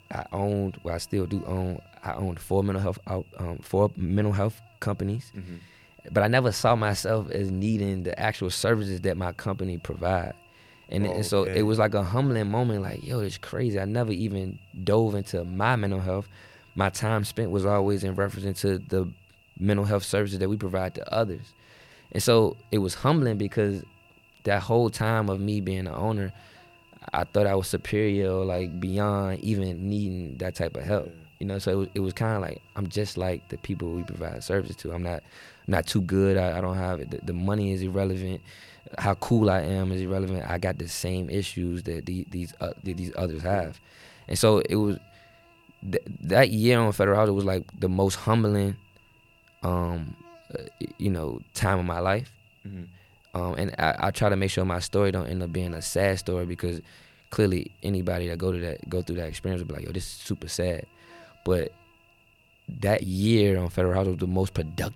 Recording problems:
electrical hum; faint; throughout; 50 Hz, 25 dB below the speech

